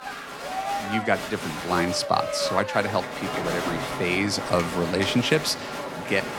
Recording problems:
crowd noise; loud; throughout; 5 dB below the speech

